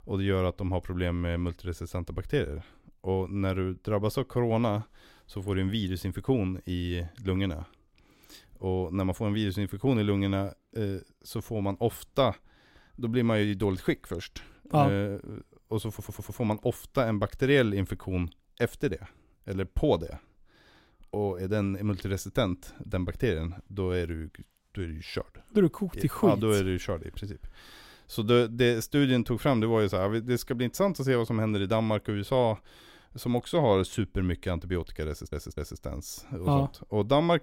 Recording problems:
audio stuttering; at 16 s and at 35 s

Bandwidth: 16 kHz